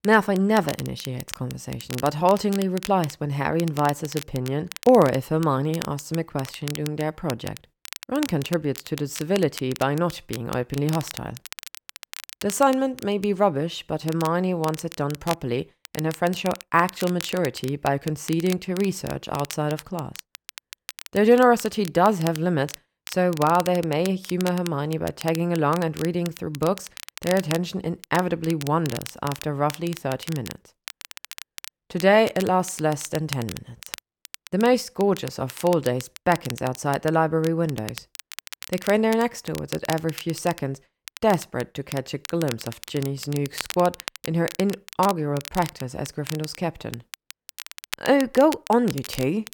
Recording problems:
crackle, like an old record; noticeable; 15 dB below the speech

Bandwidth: 18 kHz